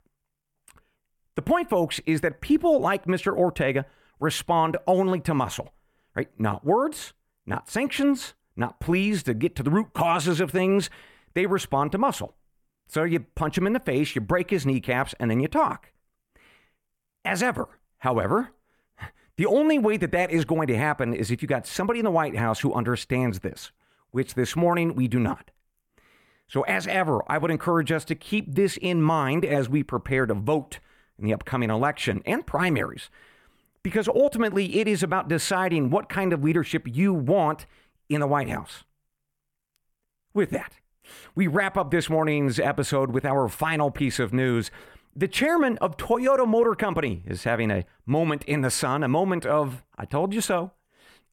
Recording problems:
none

